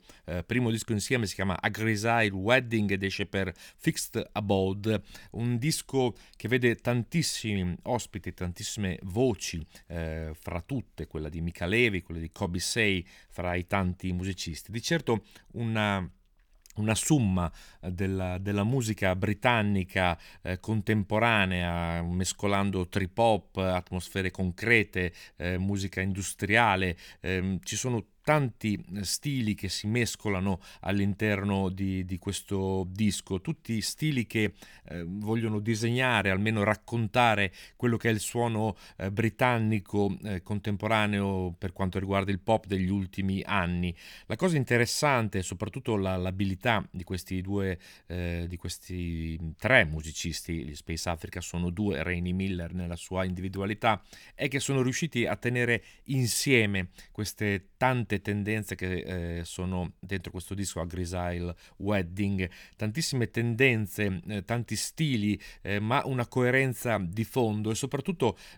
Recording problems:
none

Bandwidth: 18.5 kHz